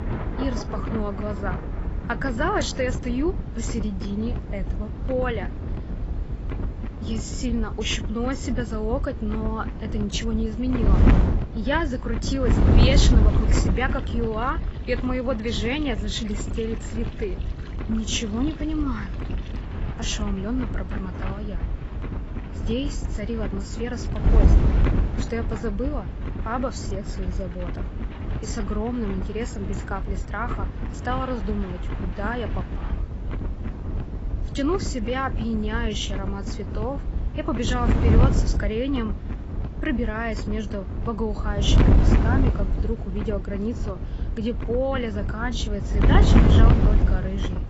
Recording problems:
garbled, watery; badly; nothing above 7.5 kHz
wind noise on the microphone; heavy; 6 dB below the speech
rain or running water; noticeable; until 33 s; 15 dB below the speech

